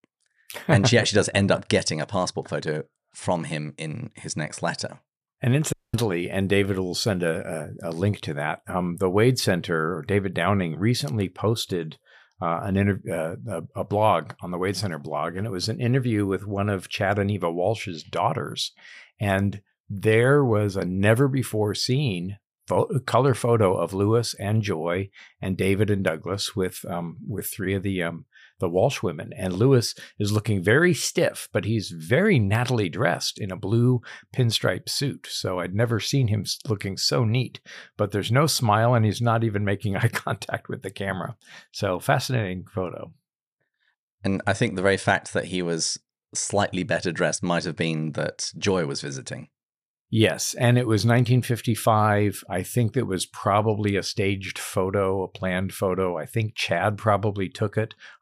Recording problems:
audio cutting out; at 5.5 s

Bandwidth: 15 kHz